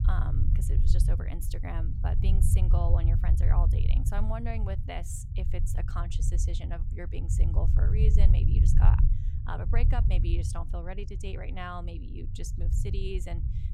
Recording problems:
low rumble; loud; throughout; 4 dB below the speech

